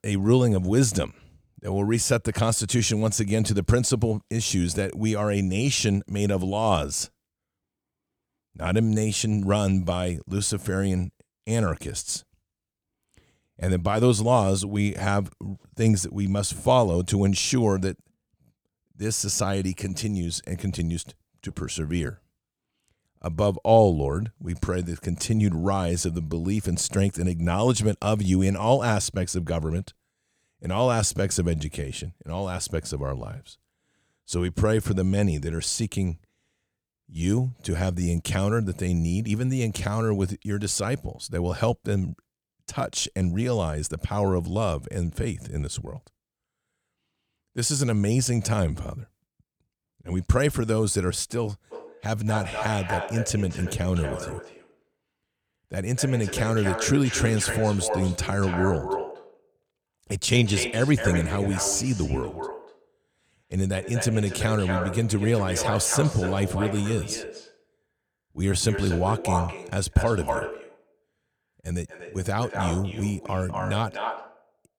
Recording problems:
echo of what is said; strong; from 52 s on; 240 ms later, 8 dB below the speech

